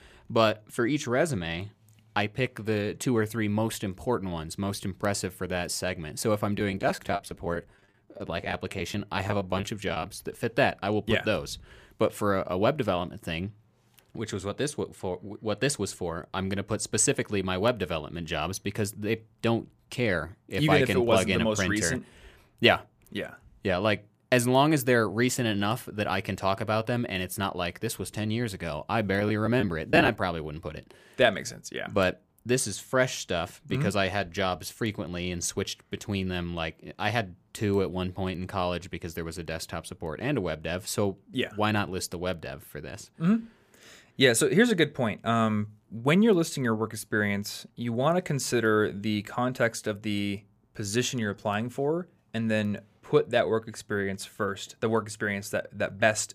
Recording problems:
choppy; very; from 6.5 to 10 s and at 29 s; 14% of the speech affected

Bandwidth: 15 kHz